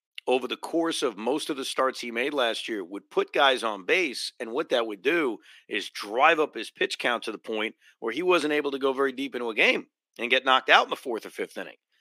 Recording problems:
thin; somewhat; fading below 300 Hz

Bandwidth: 15 kHz